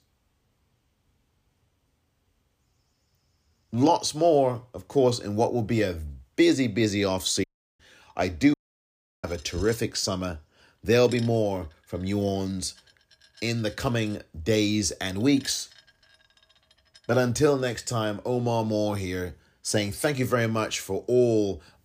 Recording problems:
household noises; faint; from 8 s on; 25 dB below the speech
audio cutting out; at 7.5 s and at 8.5 s for 0.5 s

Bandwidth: 15 kHz